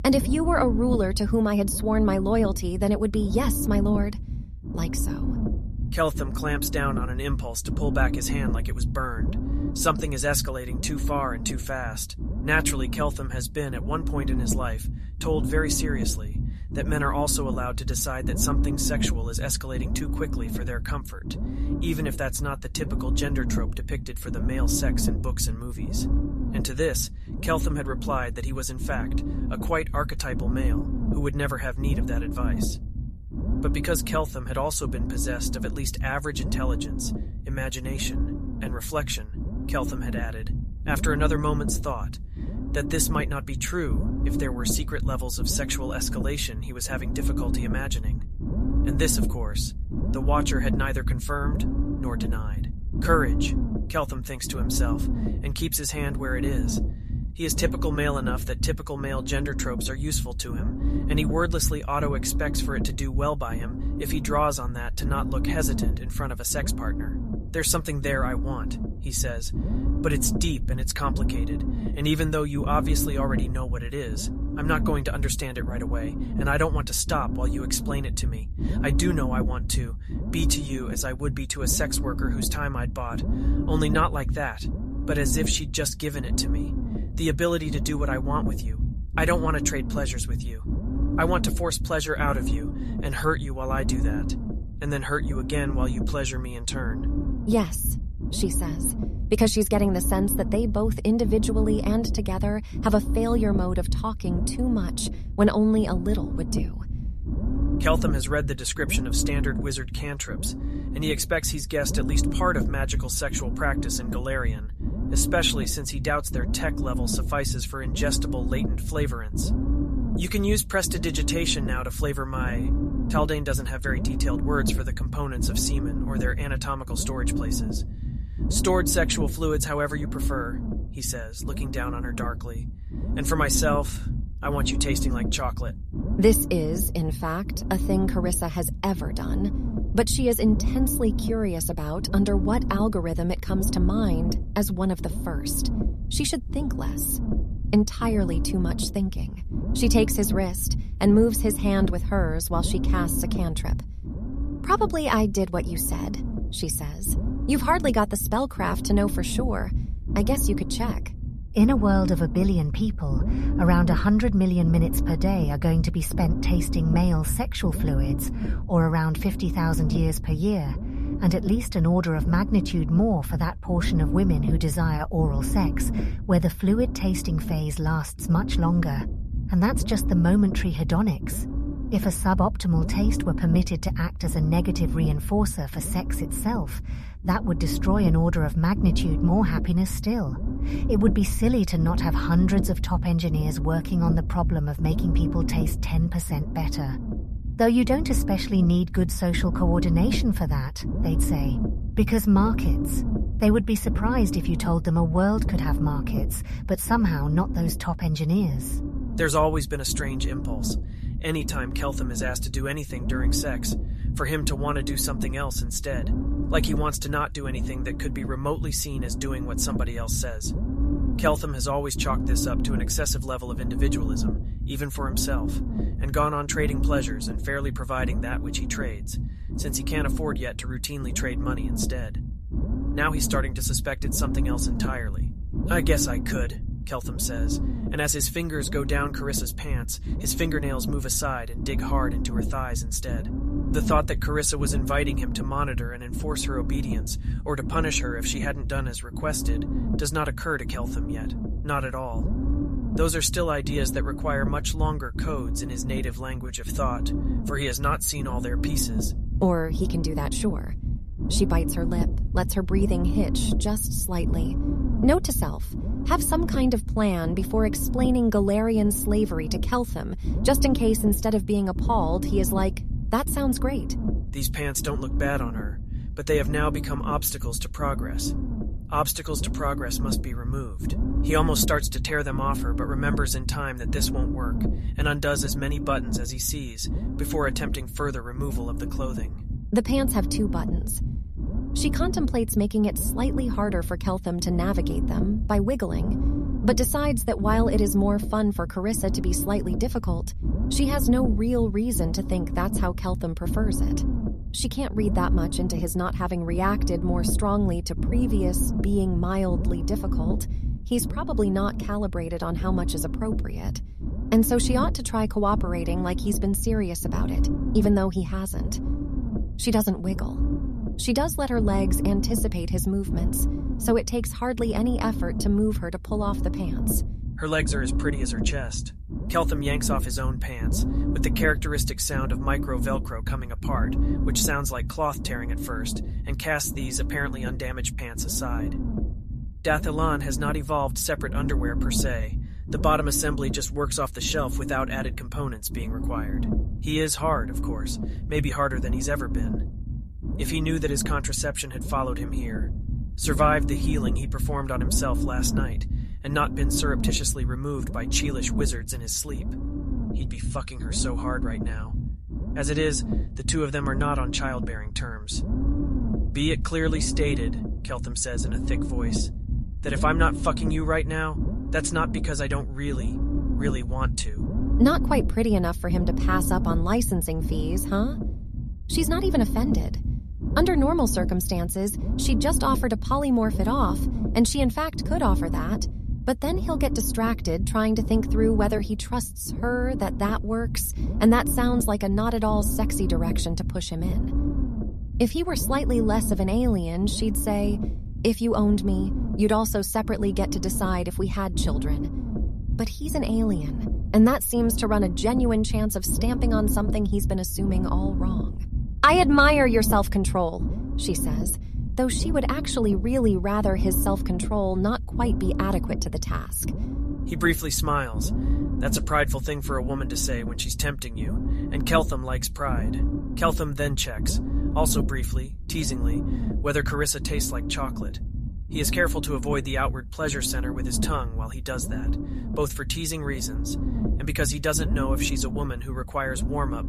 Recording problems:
low rumble; noticeable; throughout; 10 dB below the speech

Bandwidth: 14 kHz